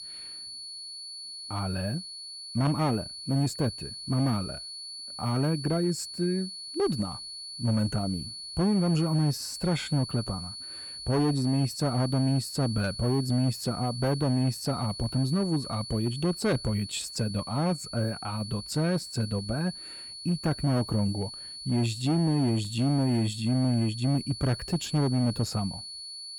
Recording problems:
distortion; slight; 10% of the sound clipped
high-pitched whine; loud; throughout; 4.5 kHz, 9 dB below the speech

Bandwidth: 17 kHz